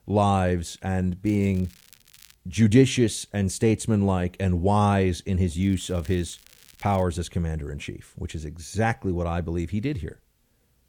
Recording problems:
crackling; faint; from 1.5 to 2.5 s and from 5.5 to 7 s; 25 dB below the speech

